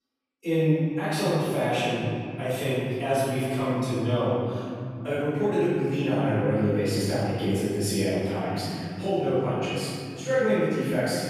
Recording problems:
room echo; strong; dies away in 3 s
off-mic speech; far

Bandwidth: 14.5 kHz